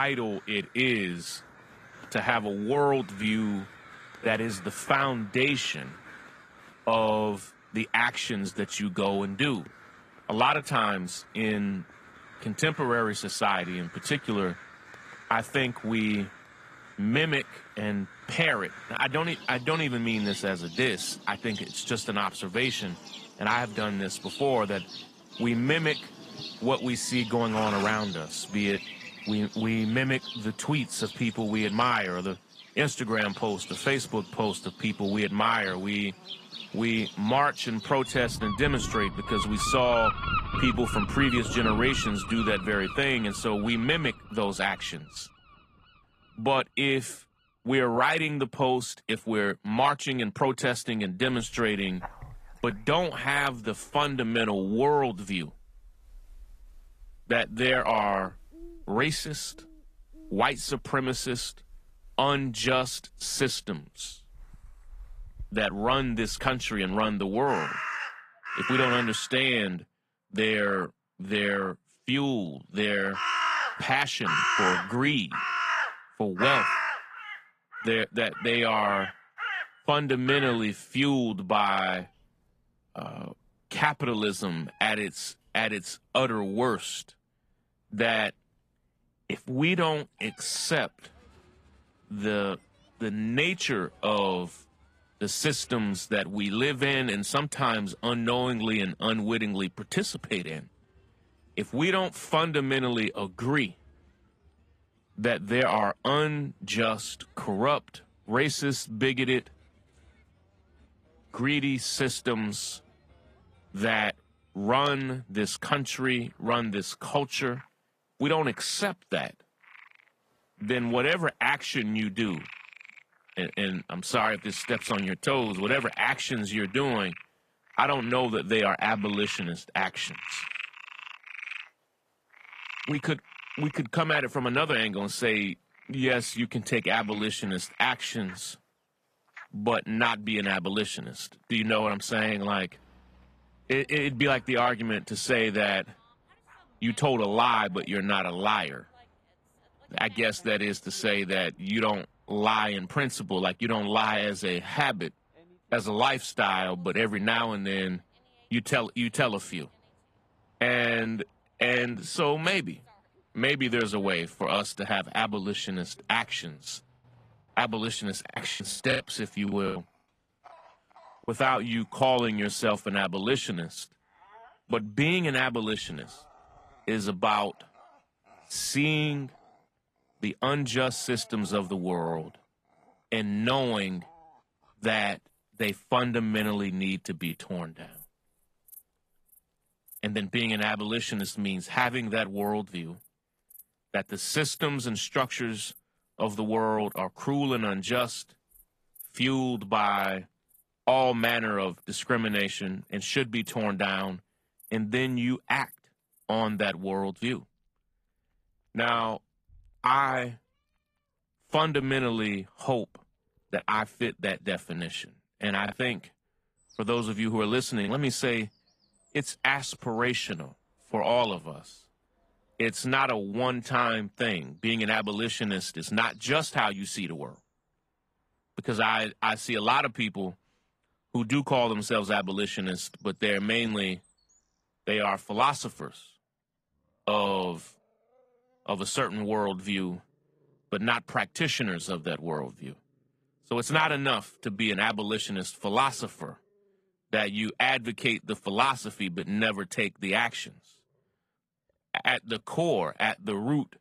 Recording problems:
garbled, watery; slightly; nothing above 14.5 kHz
animal sounds; loud; throughout; 9 dB below the speech
abrupt cut into speech; at the start
choppy; very; from 2:48 to 2:51 and from 3:36 to 3:38; 11% of the speech affected

